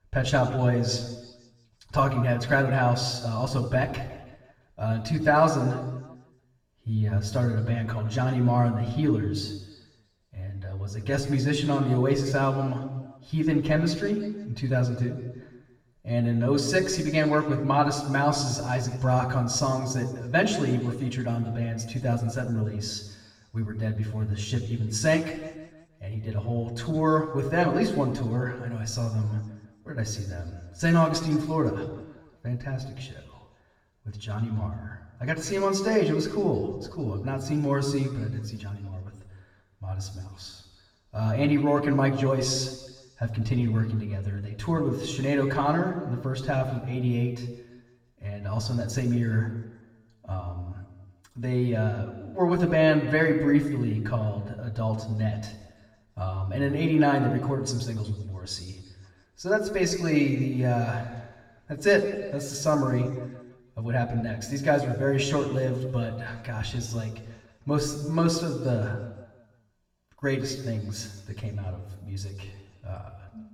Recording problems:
off-mic speech; far
room echo; slight; dies away in 1.2 s

